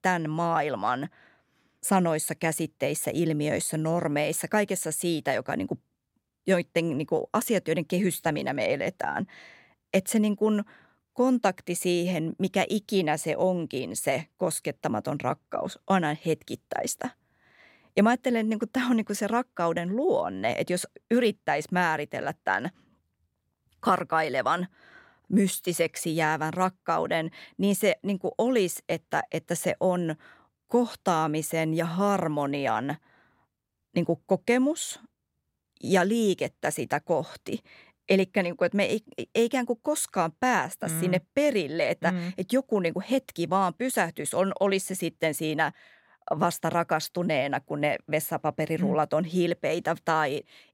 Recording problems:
none

